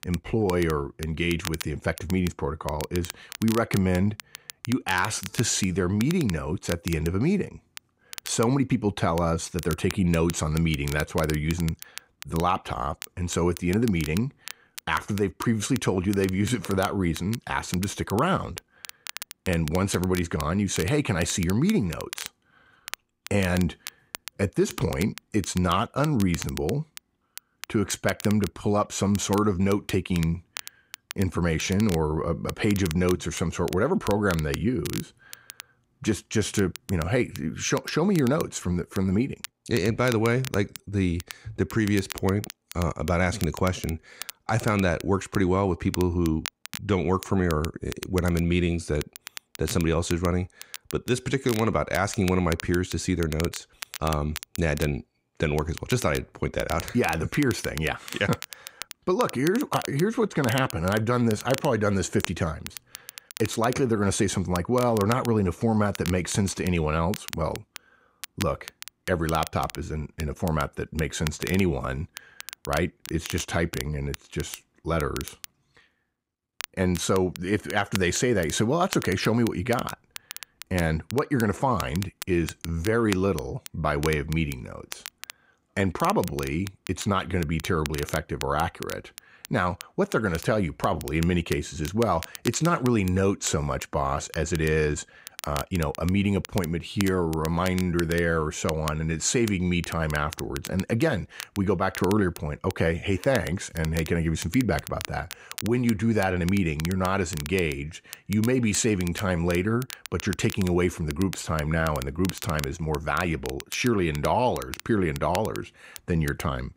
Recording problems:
crackle, like an old record; noticeable; 15 dB below the speech

